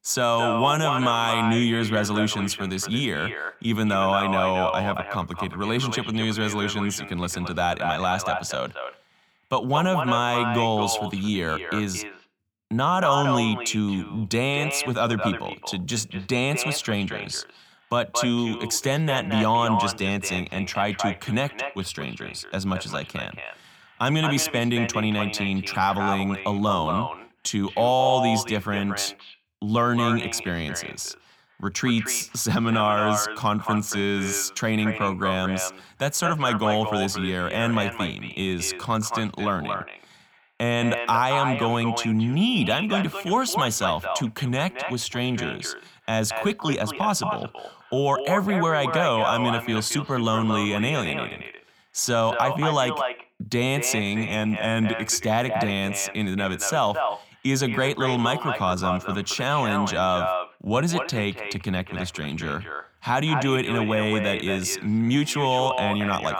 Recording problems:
echo of what is said; strong; throughout; 230 ms later, 6 dB below the speech

